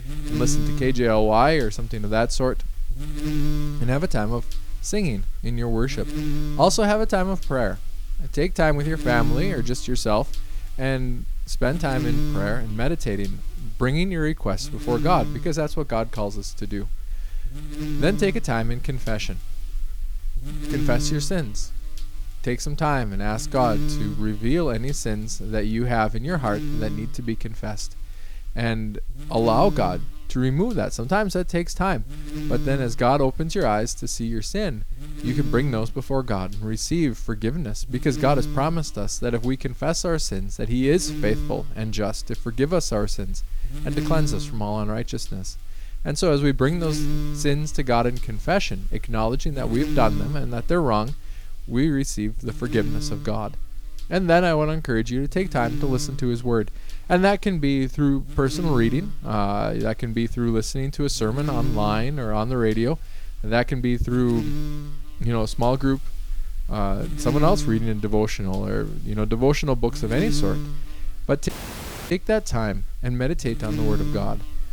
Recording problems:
electrical hum; very faint; throughout; 60 Hz, 15 dB below the speech
audio cutting out; at 1:11 for 0.5 s

